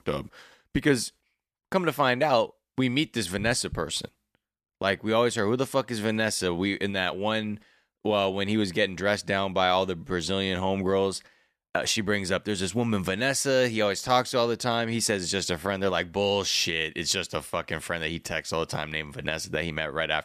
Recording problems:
none

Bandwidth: 14.5 kHz